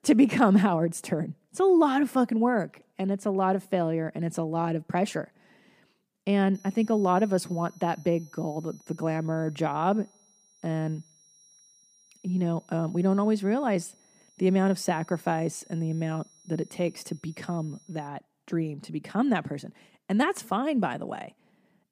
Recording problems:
high-pitched whine; faint; from 6.5 to 18 s; 5.5 kHz, 30 dB below the speech

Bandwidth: 15 kHz